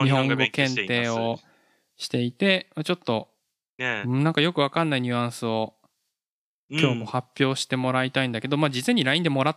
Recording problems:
abrupt cut into speech; at the start

